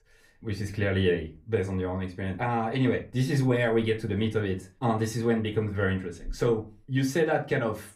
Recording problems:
room echo; very slight; dies away in 0.3 s
off-mic speech; somewhat distant

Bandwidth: 15.5 kHz